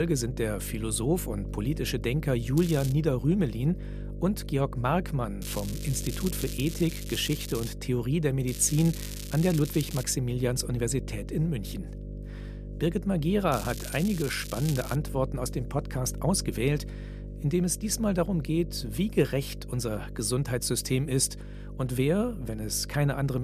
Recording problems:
electrical hum; noticeable; throughout; 50 Hz, 15 dB below the speech
crackling; noticeable; 4 times, first at 2.5 s; 10 dB below the speech
abrupt cut into speech; at the start and the end

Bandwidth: 14.5 kHz